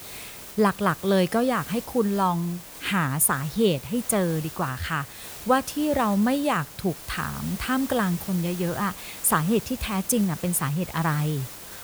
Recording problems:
hiss; noticeable; throughout; 15 dB below the speech

